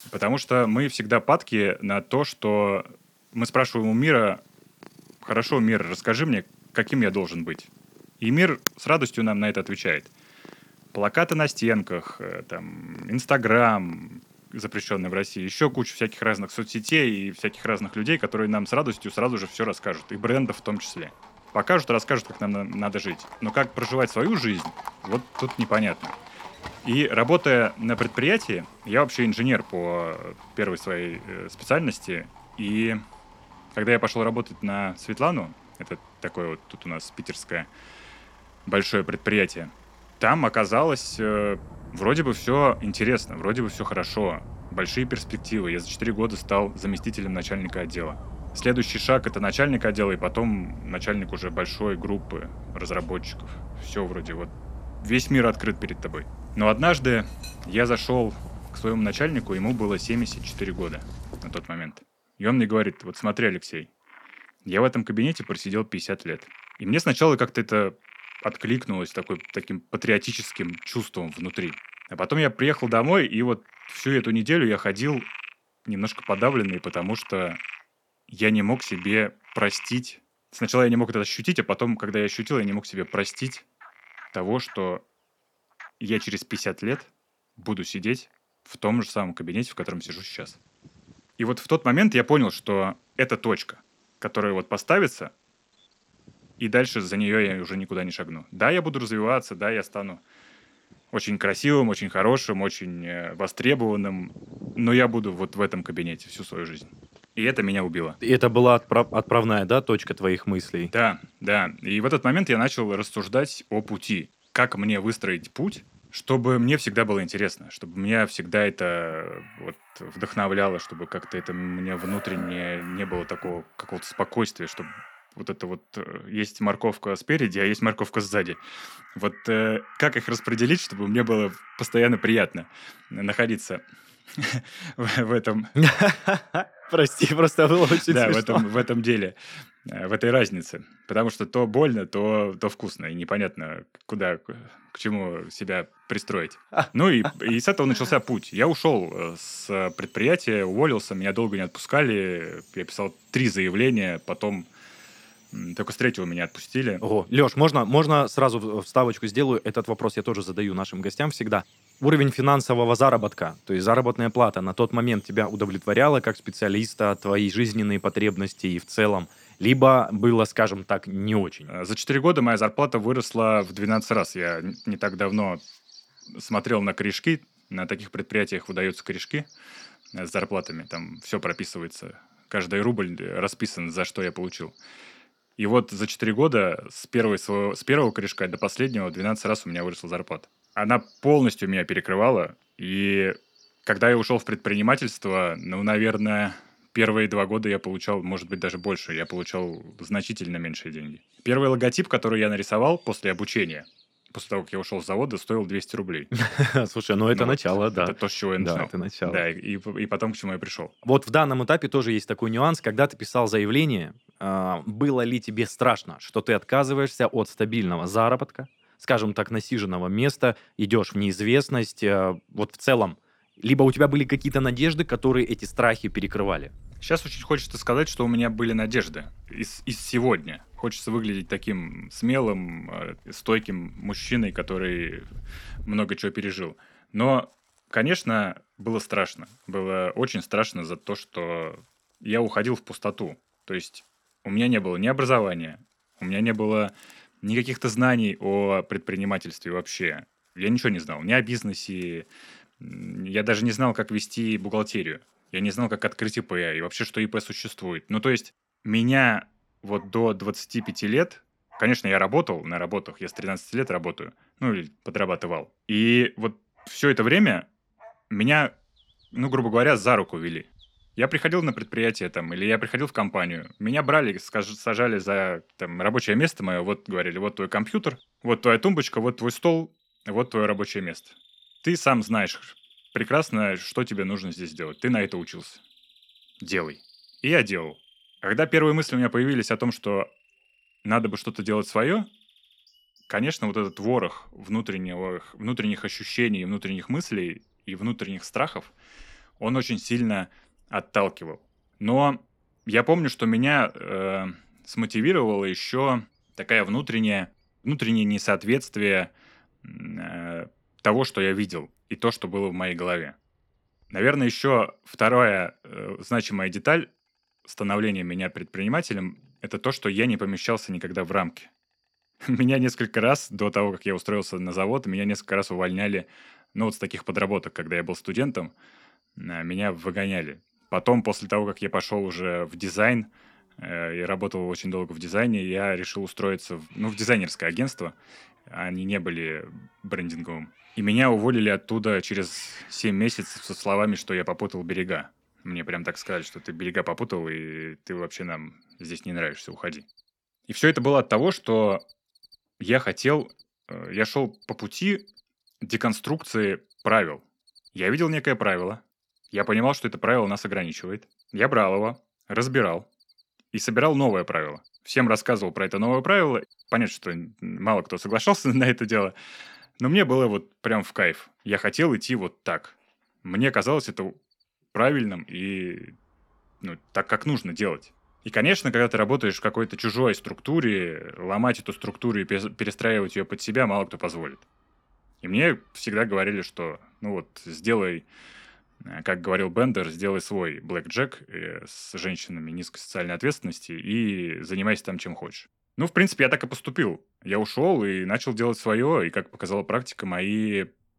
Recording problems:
animal sounds; faint; throughout; 20 dB below the speech

